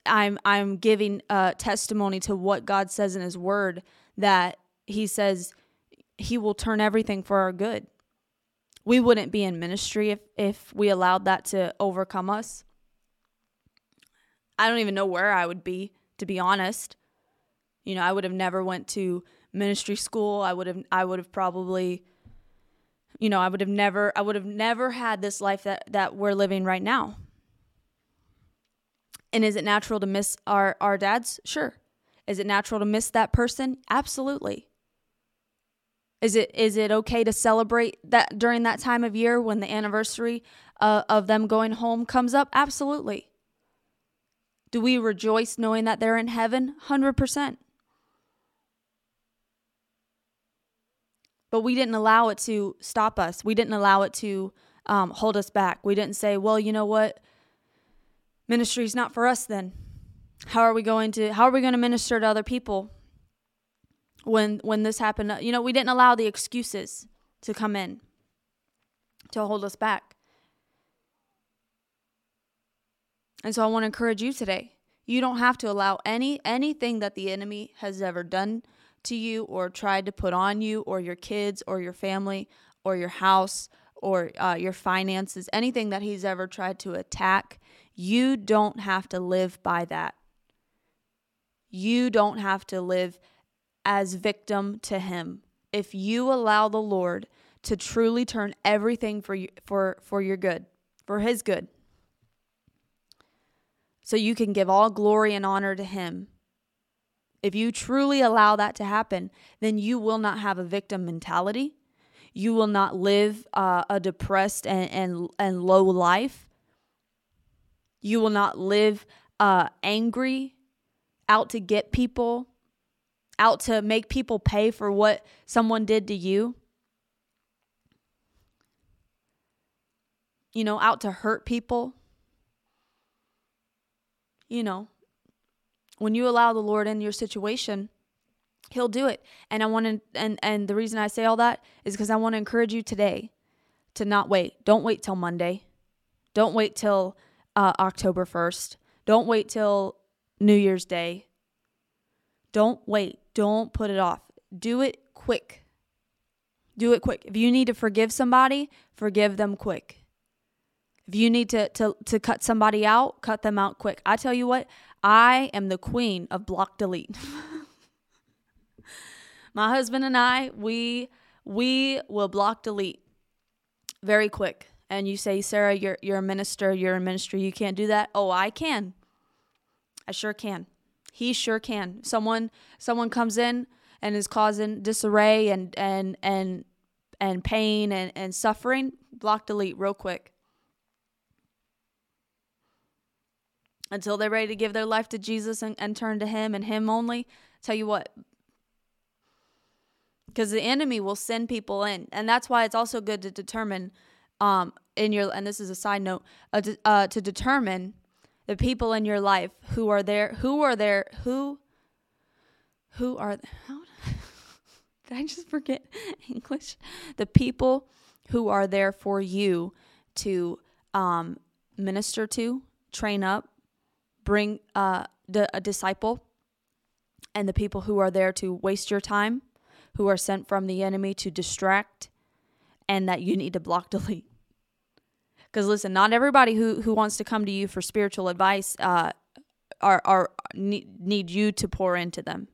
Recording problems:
none

